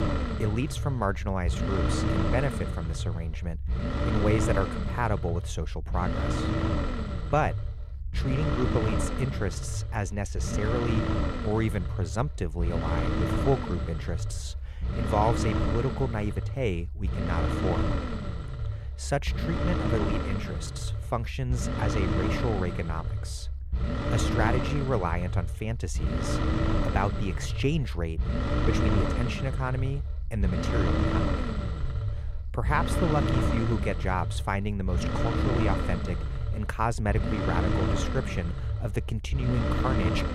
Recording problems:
low rumble; loud; throughout; 1 dB below the speech

